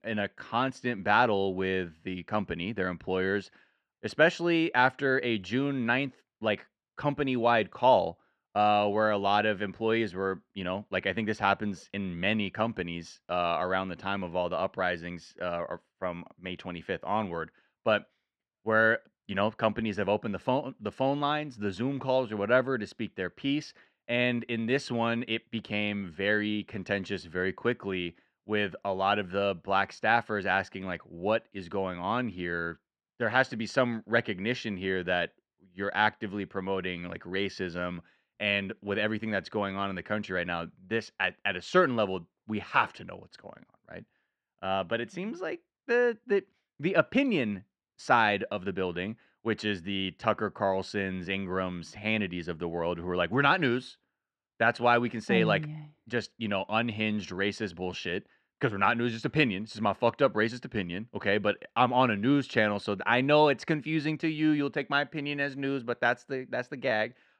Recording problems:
muffled; slightly; fading above 2.5 kHz

